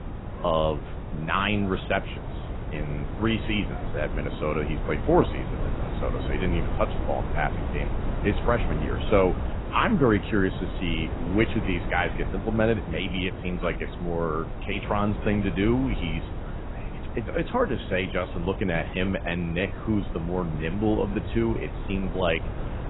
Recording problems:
garbled, watery; badly; nothing above 3.5 kHz
wind noise on the microphone; occasional gusts; 10 dB below the speech
animal sounds; faint; until 9 s; 25 dB below the speech

